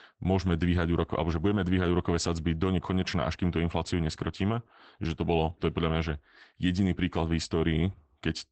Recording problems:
garbled, watery; badly; nothing above 8 kHz

